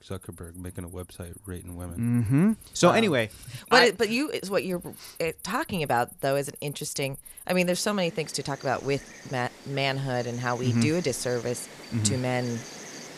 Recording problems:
animal sounds; noticeable; throughout; 20 dB below the speech

